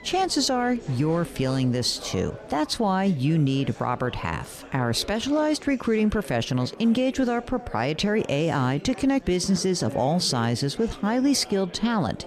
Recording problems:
chatter from many people; noticeable; throughout; 20 dB below the speech

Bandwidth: 14 kHz